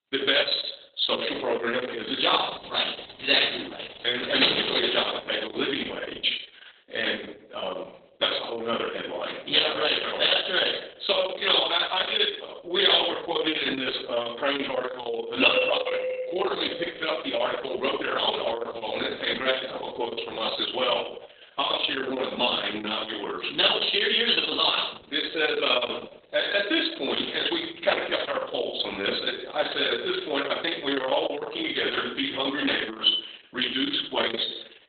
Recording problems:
off-mic speech; far
garbled, watery; badly; nothing above 4 kHz
room echo; noticeable; dies away in 0.5 s
thin; very slightly; fading below 300 Hz
door banging; loud; at 4 s; peak 4 dB above the speech
doorbell; loud; from 15 to 17 s; peak 2 dB above the speech

